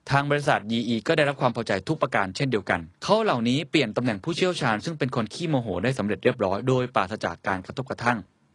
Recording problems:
garbled, watery; slightly; nothing above 10 kHz

